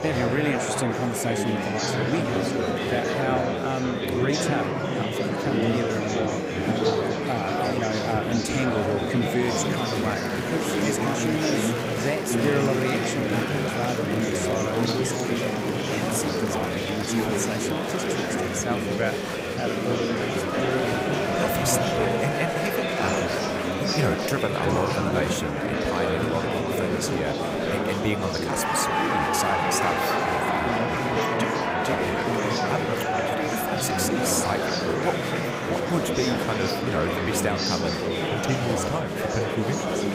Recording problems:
murmuring crowd; very loud; throughout; 4 dB above the speech

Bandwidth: 15.5 kHz